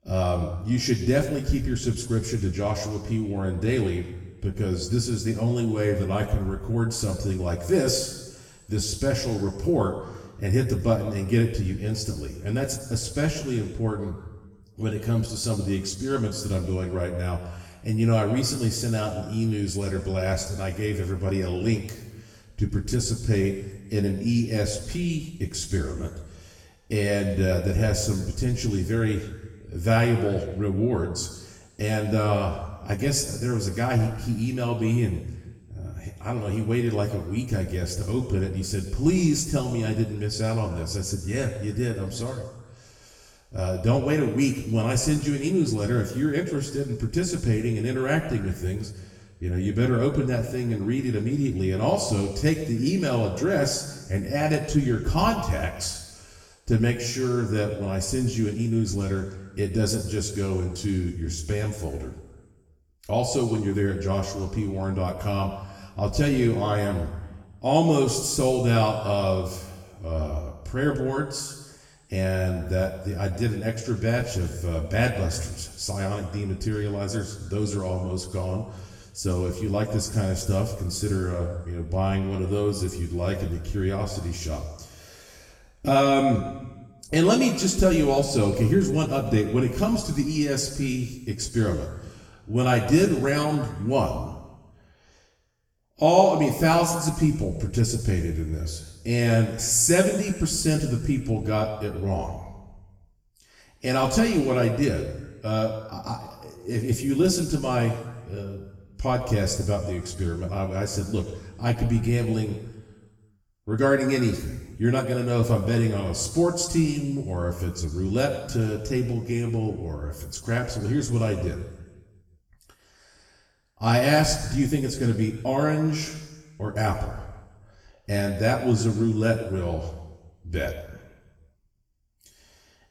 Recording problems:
off-mic speech; far
room echo; noticeable; dies away in 1.1 s

